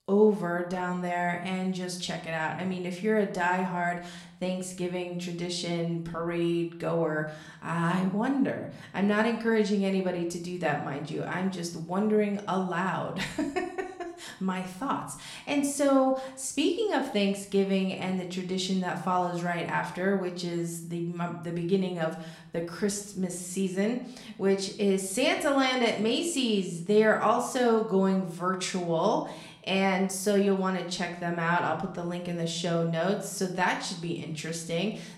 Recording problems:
room echo; slight; dies away in 0.5 s
off-mic speech; somewhat distant

